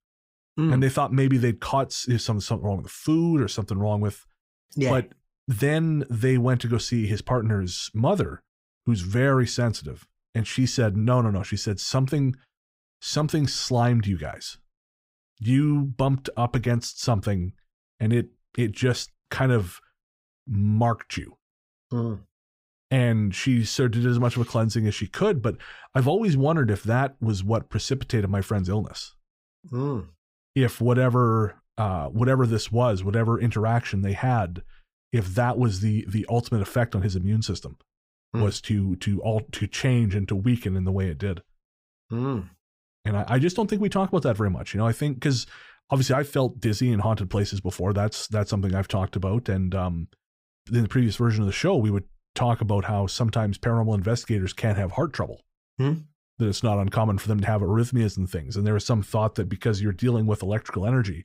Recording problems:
none

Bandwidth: 15.5 kHz